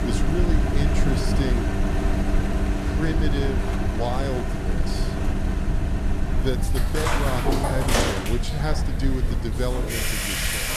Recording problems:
household noises; very loud; throughout; 2 dB above the speech
low rumble; loud; throughout; 8 dB below the speech

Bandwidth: 14 kHz